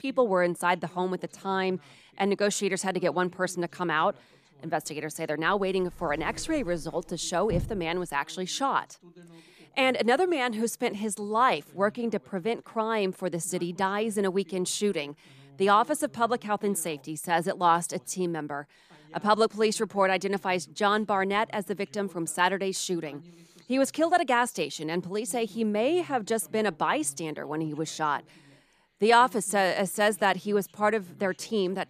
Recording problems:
voice in the background; faint; throughout; 25 dB below the speech
door banging; noticeable; from 6 to 8 s; peak 7 dB below the speech

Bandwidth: 14.5 kHz